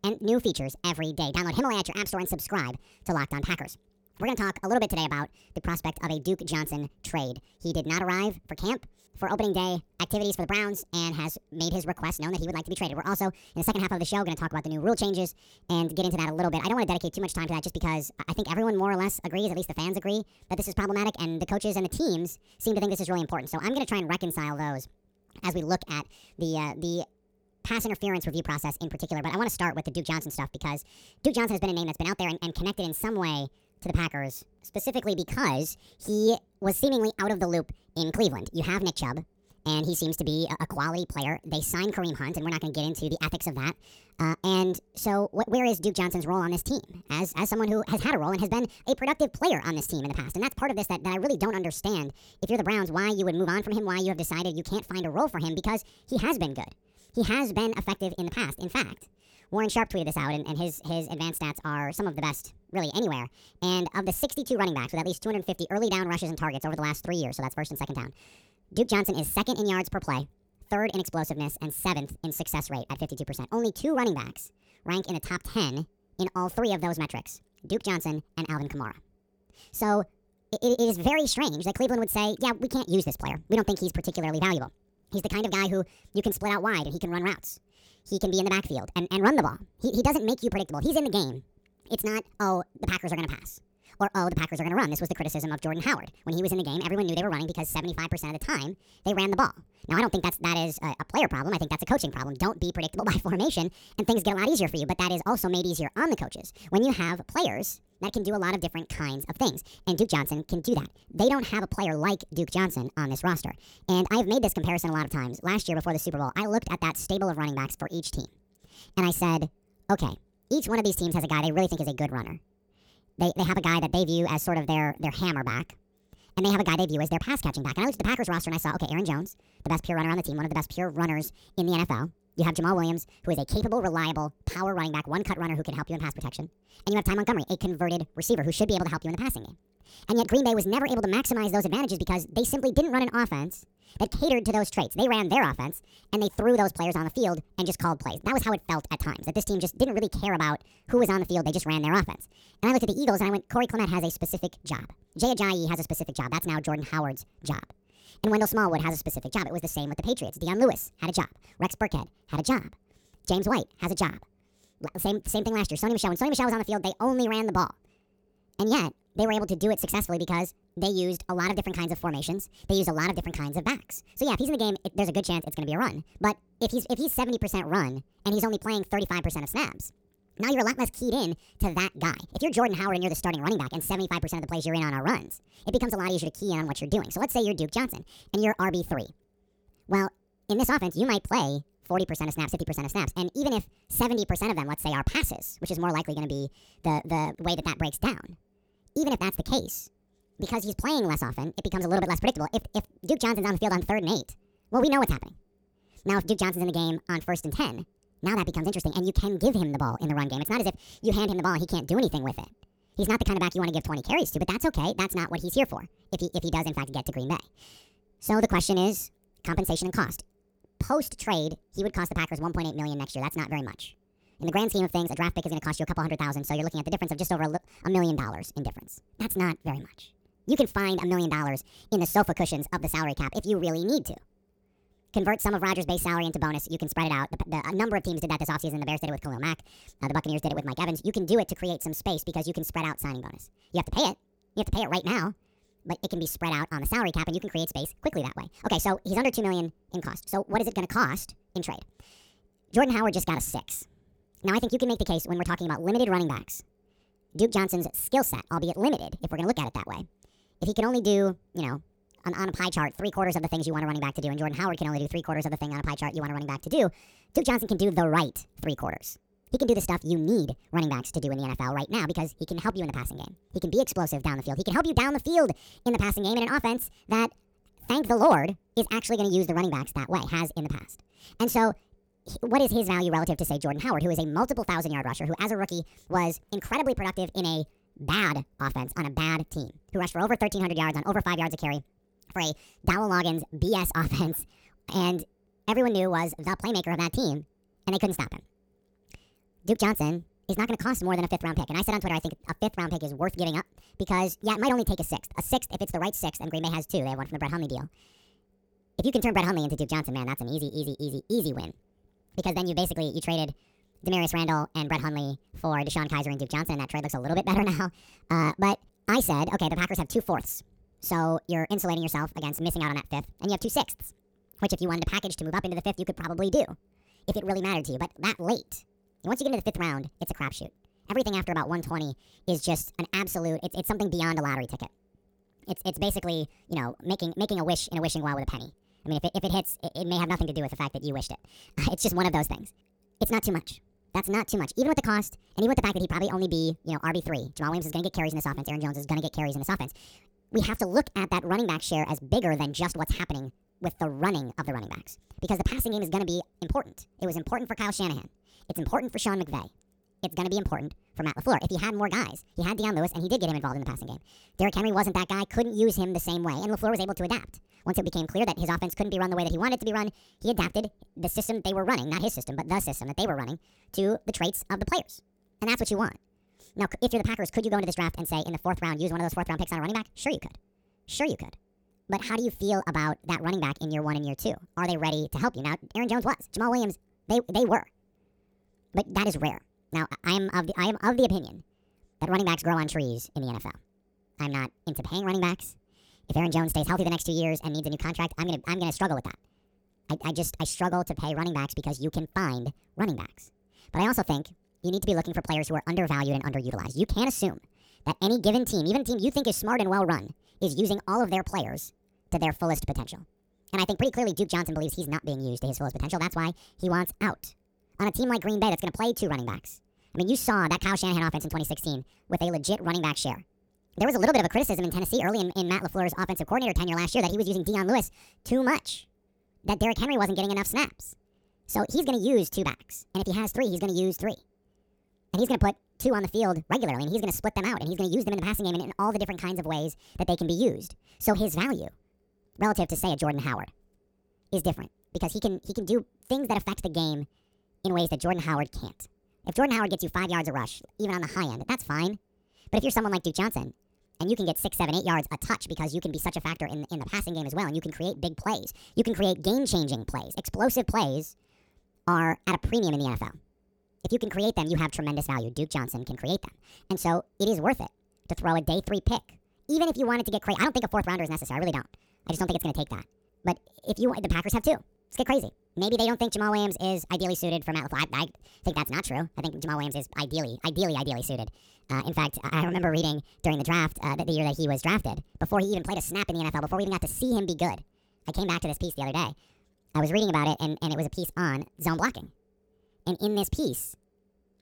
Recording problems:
wrong speed and pitch; too fast and too high; 1.6 times normal speed

